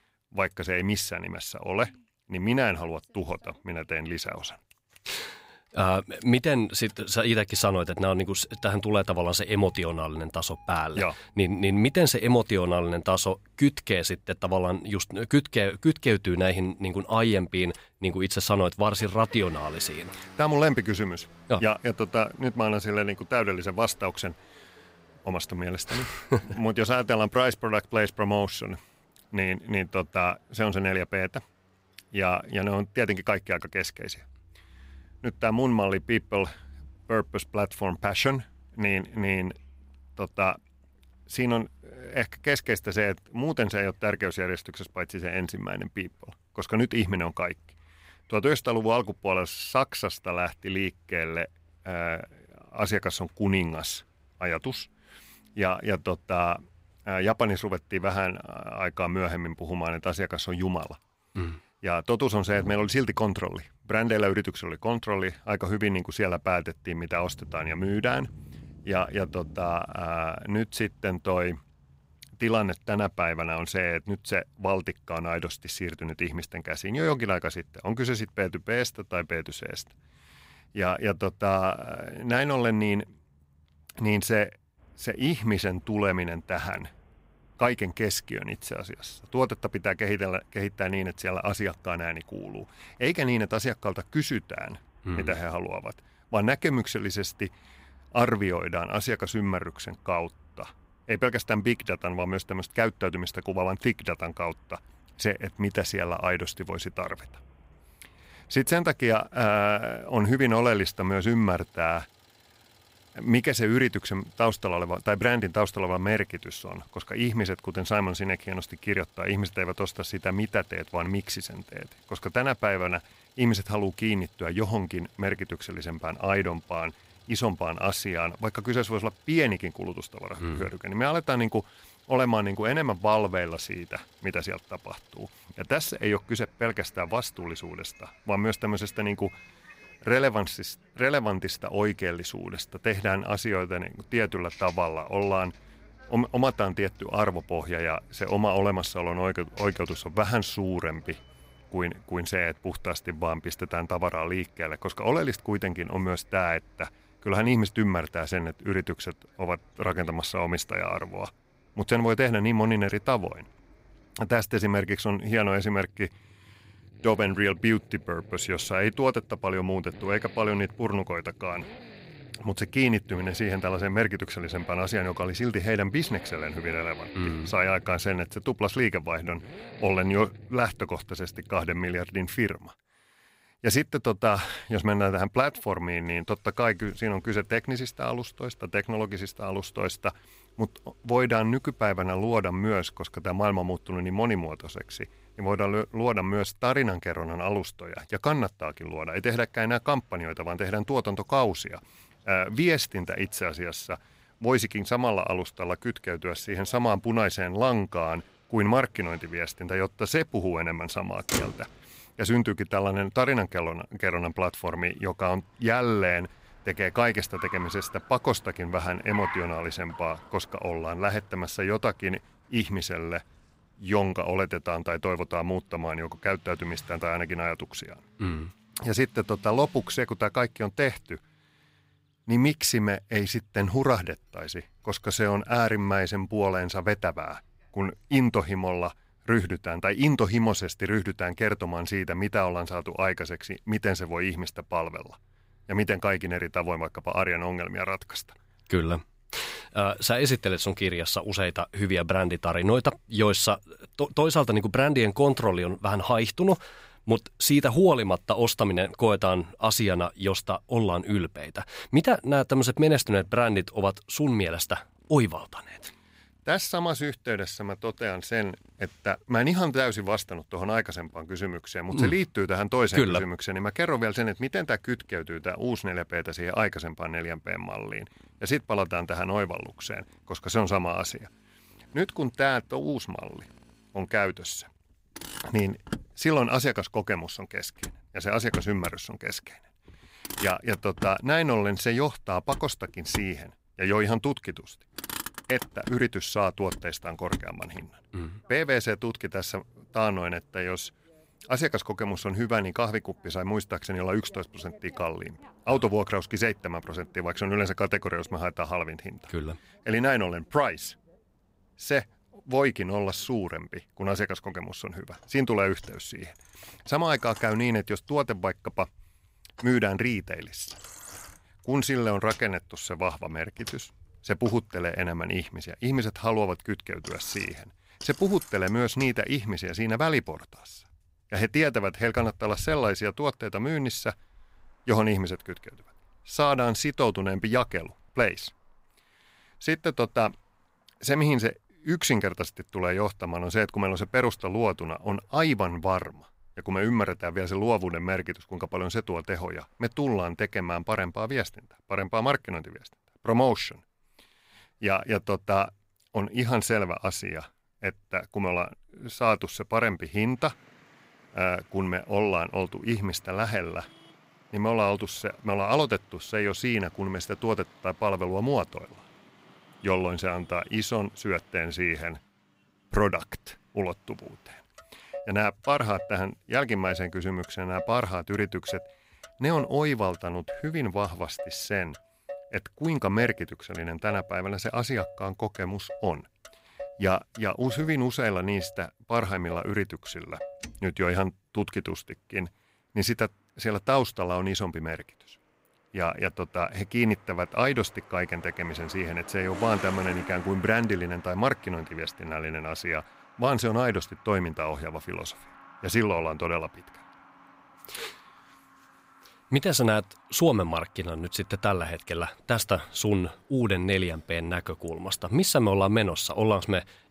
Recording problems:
traffic noise; noticeable; throughout; 20 dB below the speech

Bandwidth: 15.5 kHz